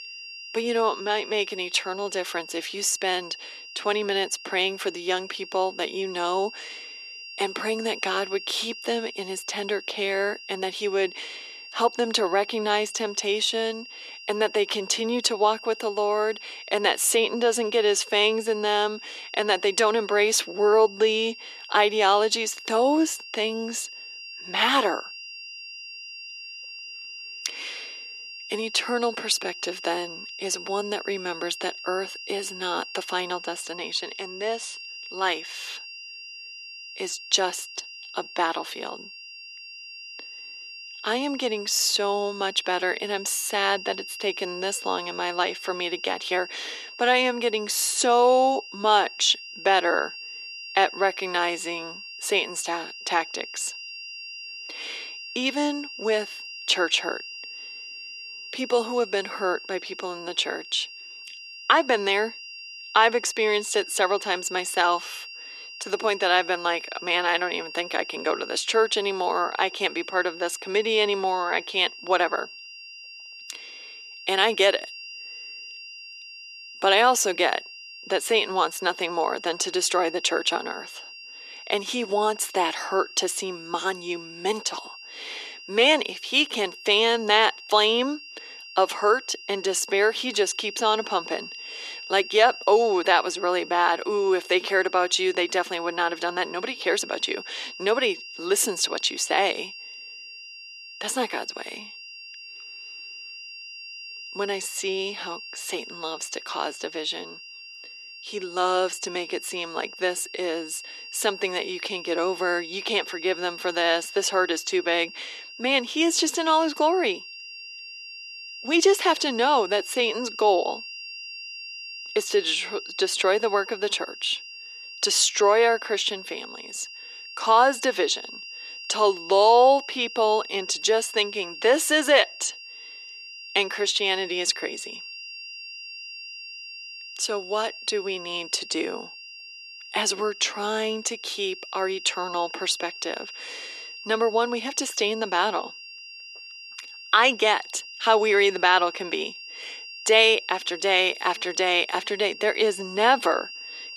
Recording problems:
thin; very; fading below 350 Hz
high-pitched whine; noticeable; throughout; 3 kHz, 15 dB below the speech

